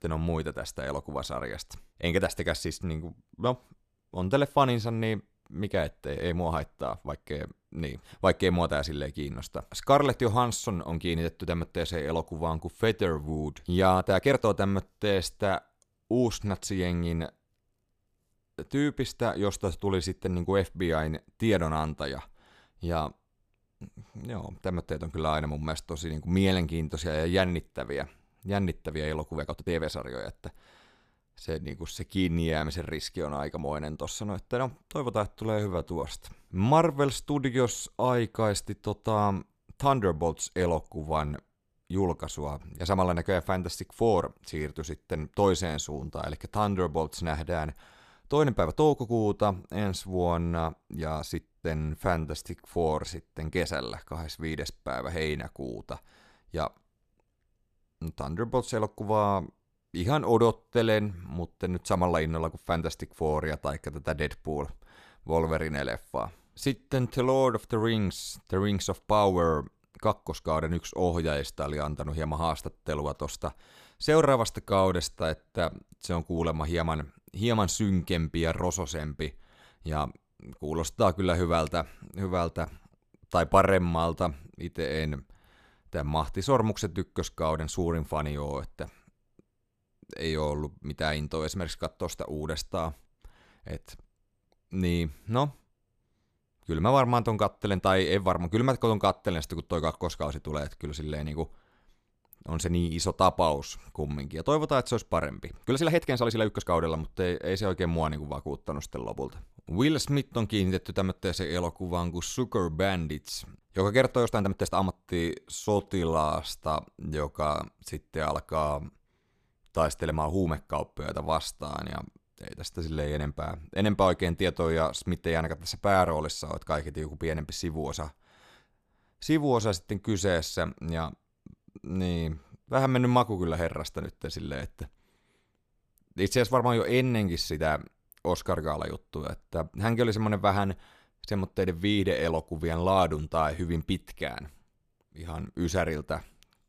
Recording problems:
uneven, jittery; strongly; from 2 s to 2:12

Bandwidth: 14.5 kHz